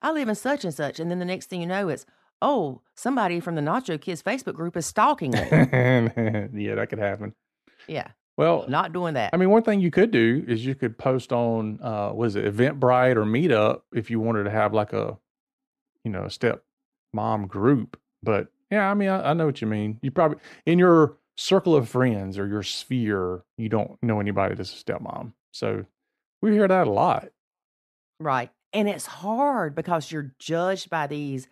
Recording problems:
muffled; slightly; fading above 2 kHz

